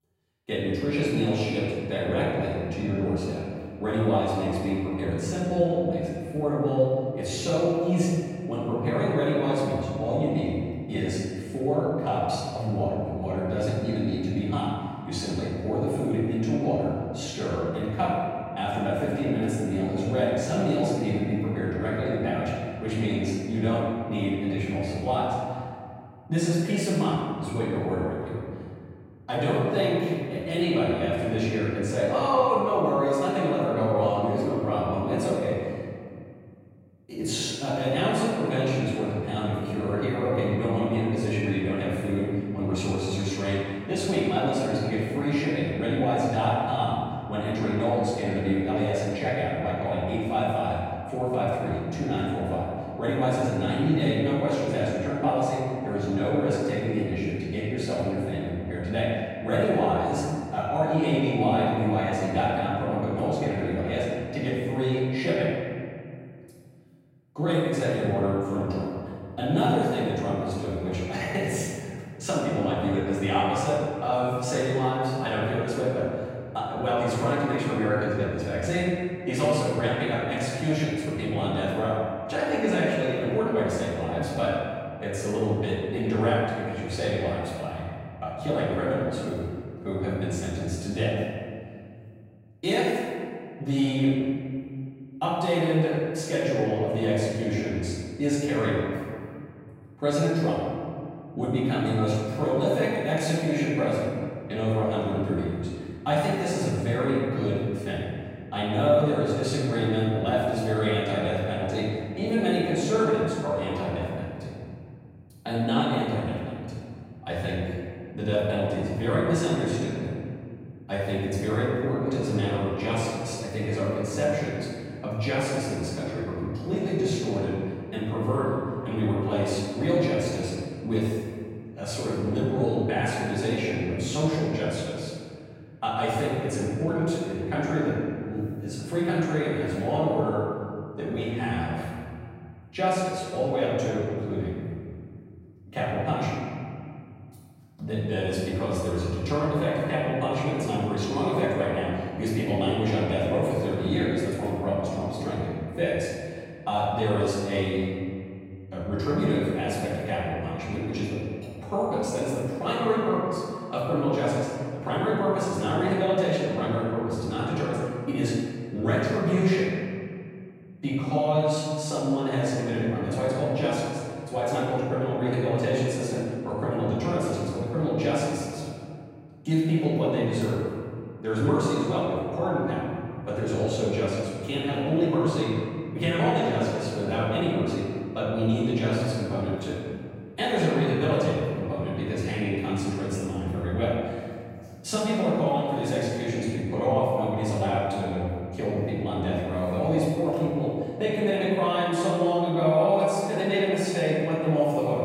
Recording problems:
room echo; strong; dies away in 2.1 s
off-mic speech; far

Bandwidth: 16 kHz